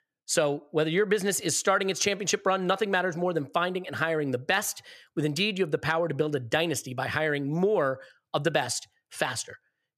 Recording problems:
none

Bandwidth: 14.5 kHz